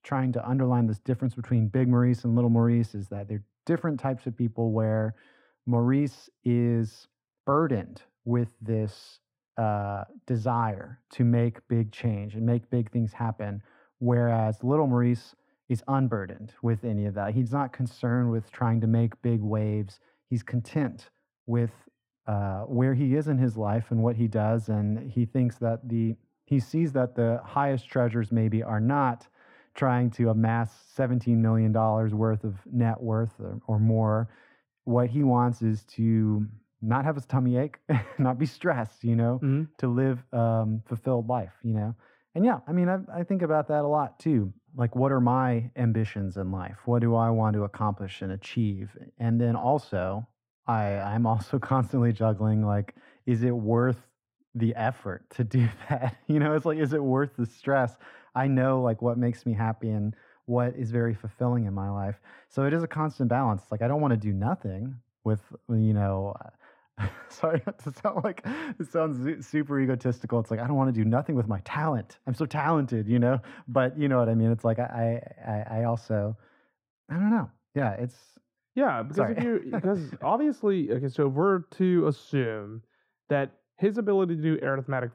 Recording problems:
muffled; very; fading above 3 kHz

